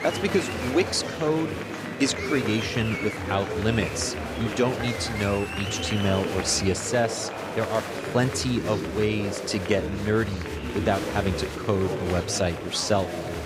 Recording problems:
chatter from many people; loud; throughout; 4 dB below the speech

